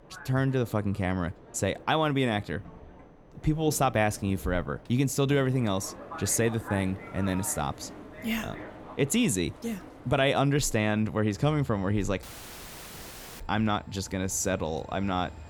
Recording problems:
train or aircraft noise; noticeable; throughout; 20 dB below the speech
audio cutting out; filled with static; at 12 s for 1 s

